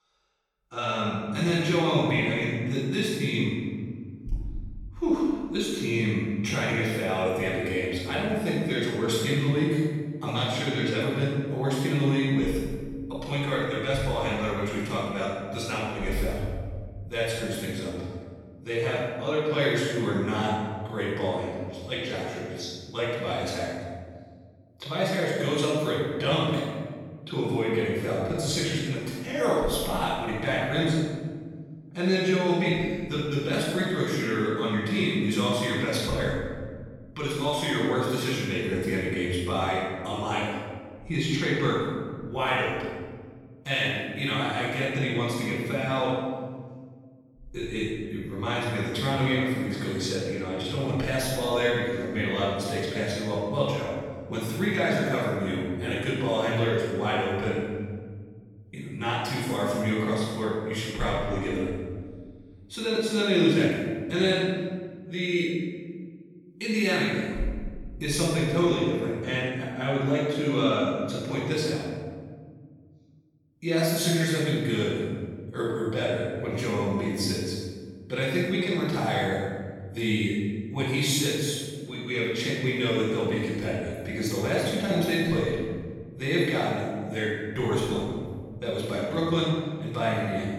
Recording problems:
room echo; strong; dies away in 1.8 s
off-mic speech; far

